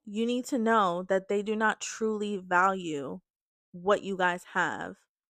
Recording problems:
none

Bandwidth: 14.5 kHz